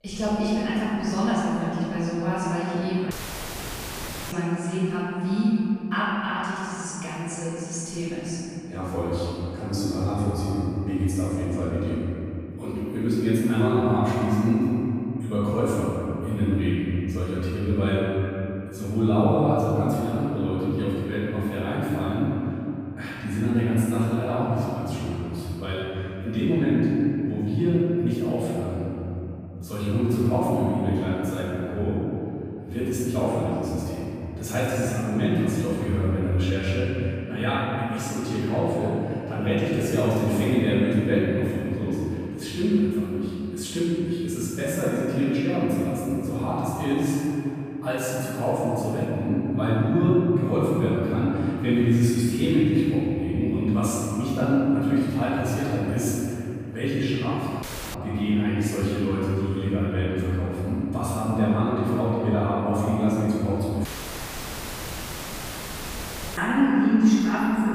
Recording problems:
room echo; strong; dies away in 3 s
off-mic speech; far
audio cutting out; at 3 s for 1 s, at 58 s and at 1:04 for 2.5 s

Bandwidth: 15 kHz